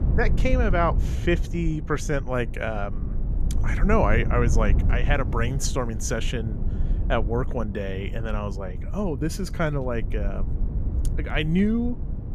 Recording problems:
low rumble; noticeable; throughout; 15 dB below the speech

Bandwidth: 14.5 kHz